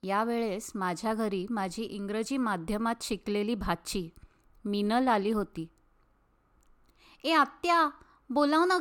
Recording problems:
abrupt cut into speech; at the end

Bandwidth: 18 kHz